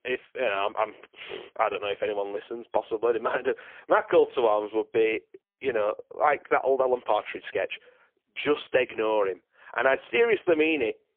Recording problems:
phone-call audio; poor line
muffled; very; fading above 3 kHz

